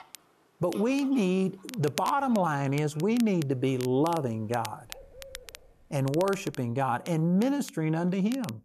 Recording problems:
crackle, like an old record; noticeable; 15 dB below the speech
animal sounds; faint; until 6.5 s; 30 dB below the speech

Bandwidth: 13.5 kHz